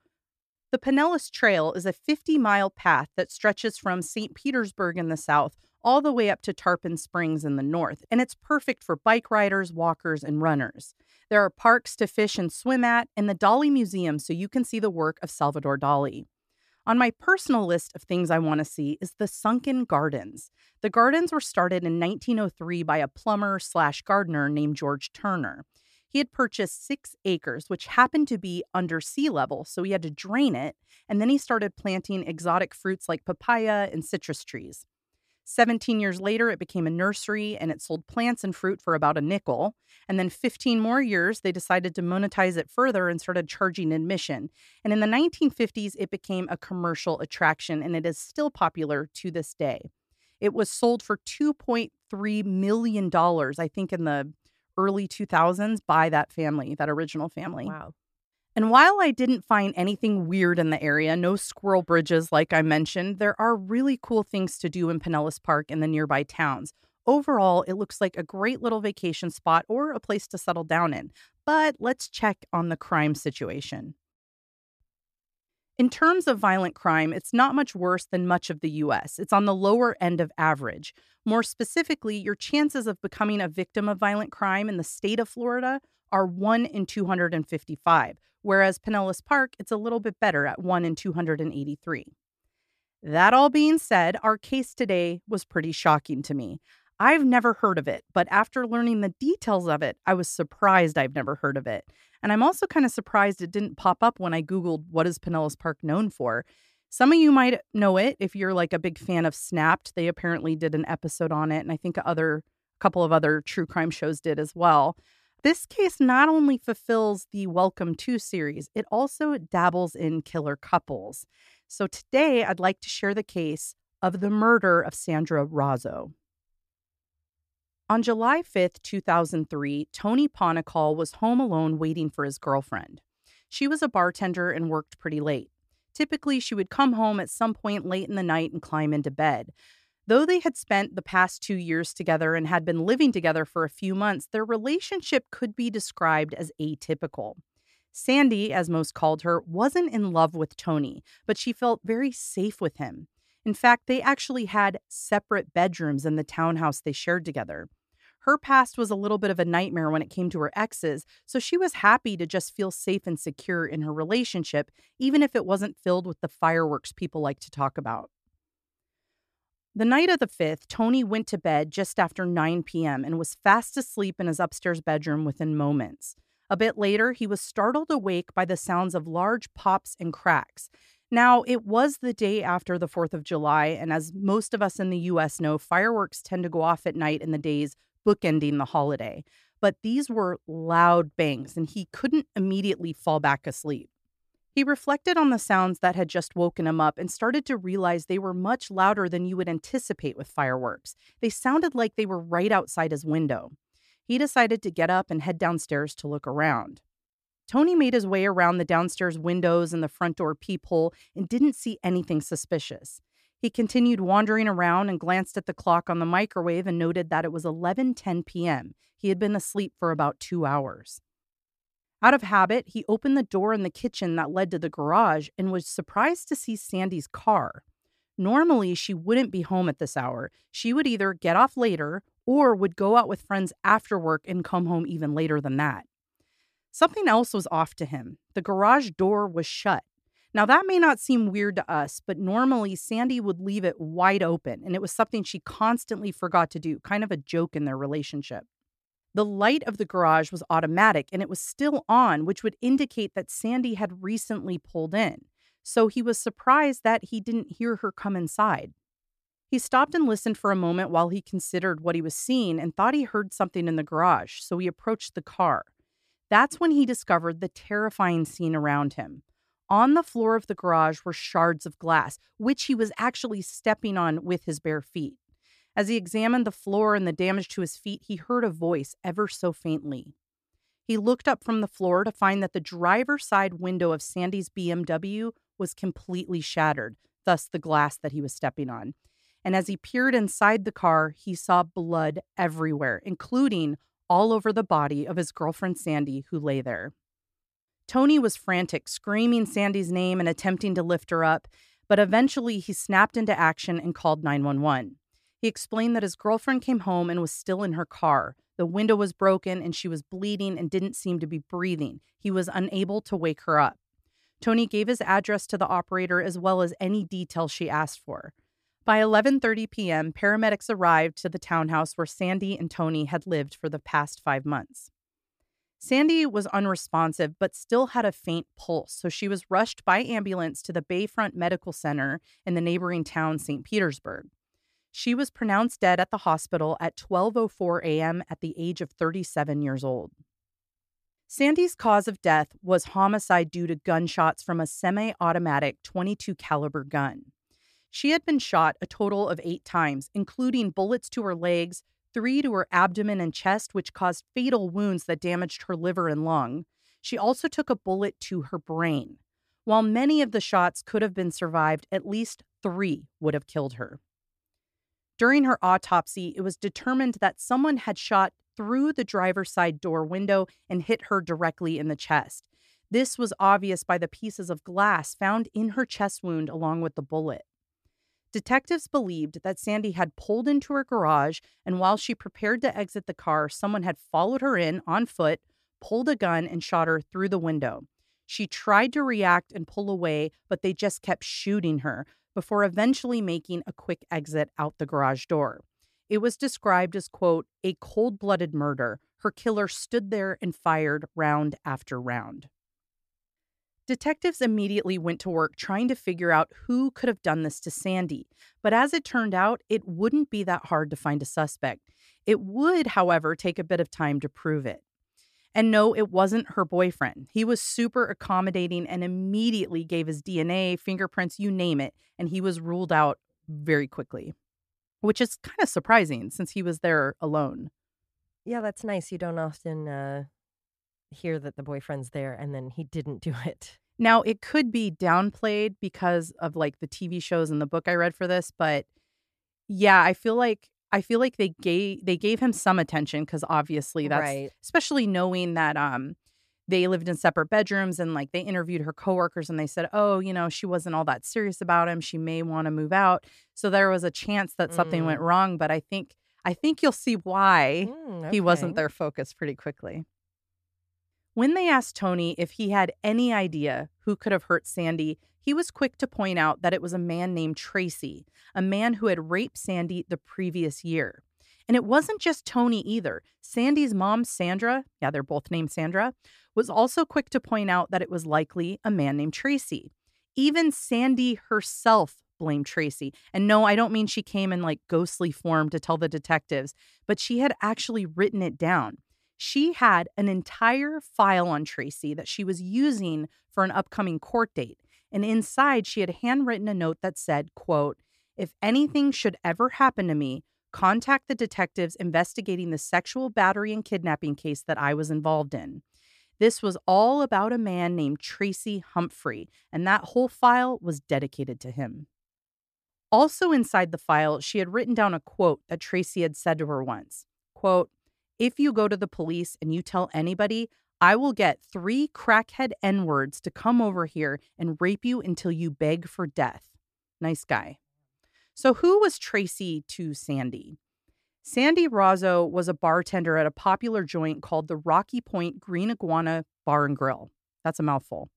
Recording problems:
none

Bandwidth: 14.5 kHz